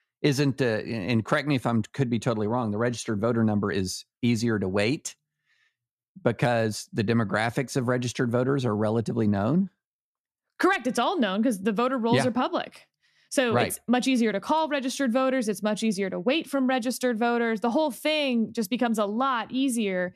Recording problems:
none

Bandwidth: 13.5 kHz